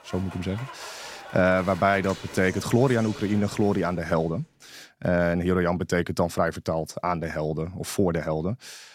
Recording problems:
crowd noise; noticeable; until 4 s; 15 dB below the speech

